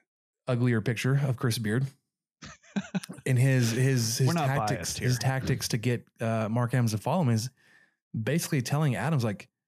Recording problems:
none

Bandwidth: 14.5 kHz